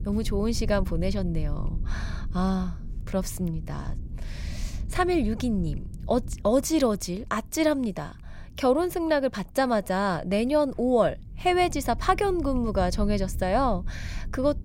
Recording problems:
low rumble; faint; throughout; 25 dB below the speech

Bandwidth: 16 kHz